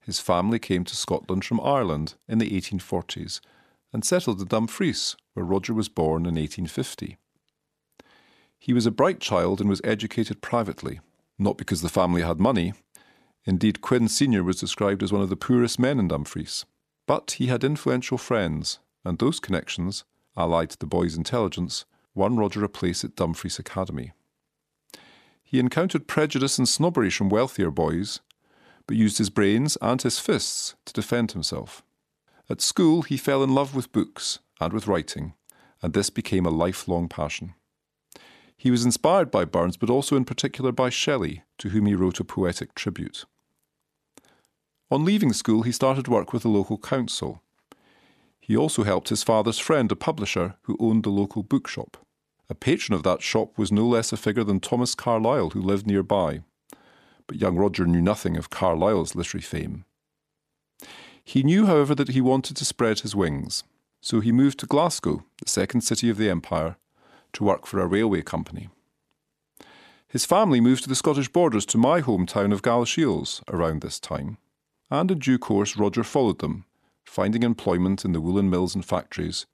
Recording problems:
none

